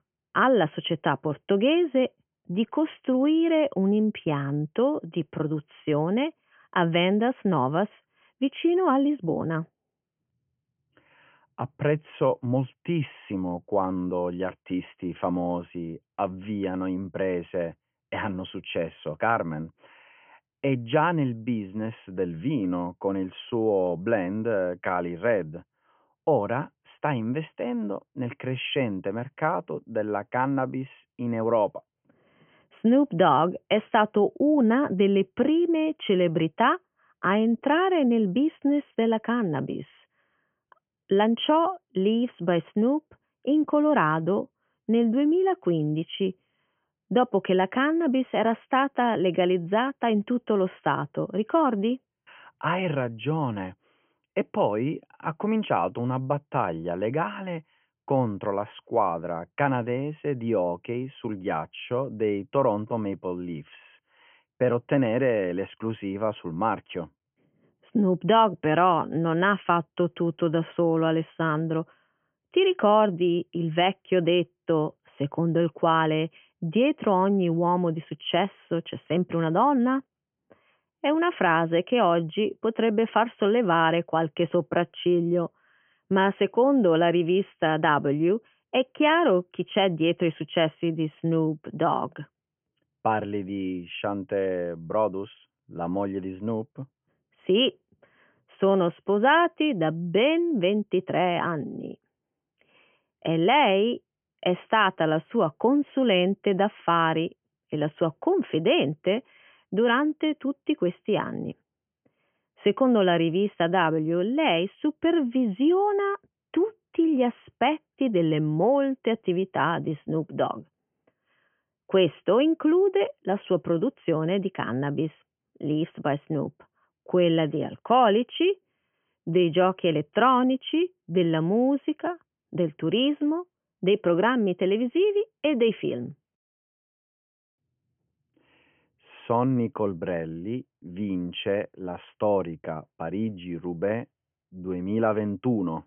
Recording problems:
high frequencies cut off; severe; nothing above 3 kHz

